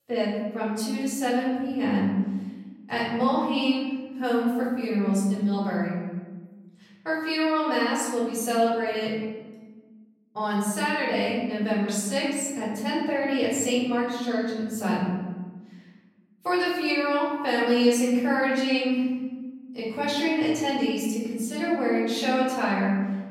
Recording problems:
off-mic speech; far
room echo; noticeable; dies away in 1.2 s

